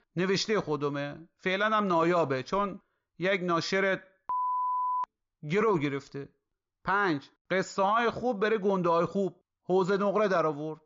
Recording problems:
high frequencies cut off; noticeable; nothing above 7 kHz

